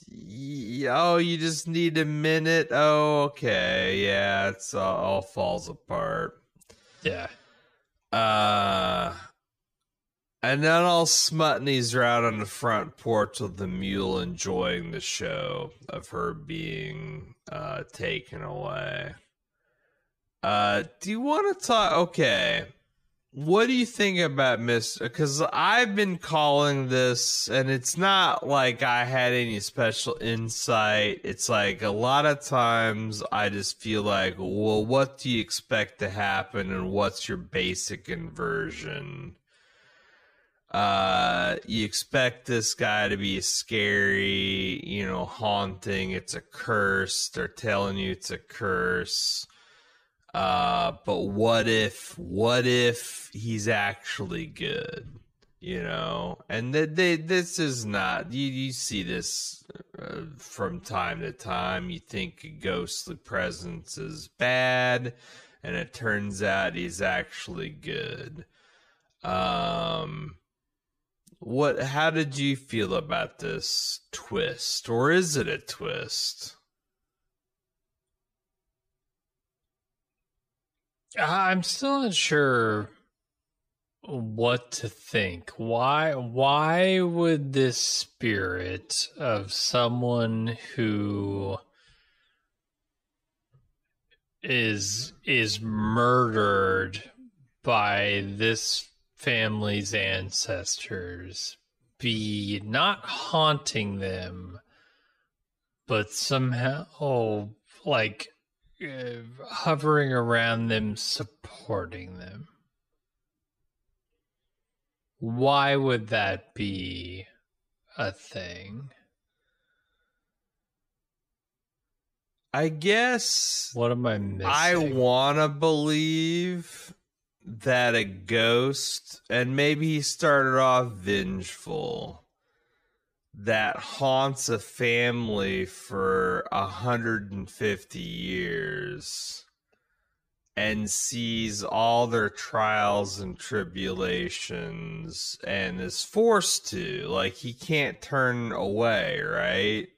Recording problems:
wrong speed, natural pitch; too slow; 0.6 times normal speed

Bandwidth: 15 kHz